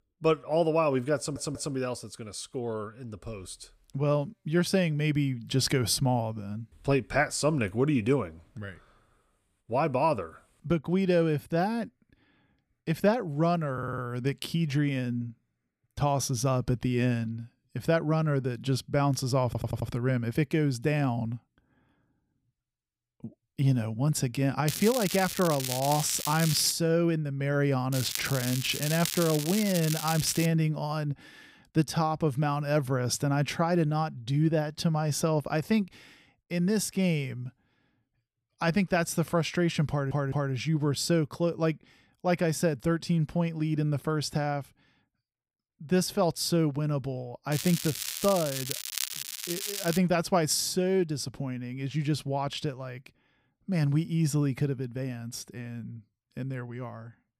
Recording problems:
crackling; loud; from 25 to 27 s, from 28 to 30 s and from 48 to 50 s; 5 dB below the speech
audio stuttering; 4 times, first at 1 s

